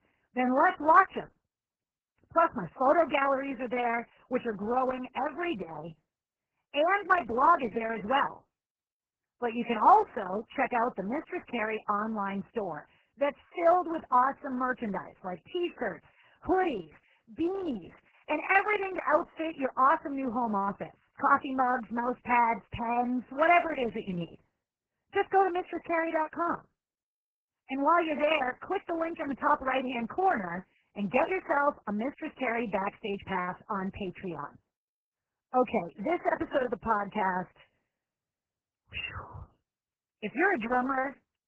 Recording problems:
garbled, watery; badly

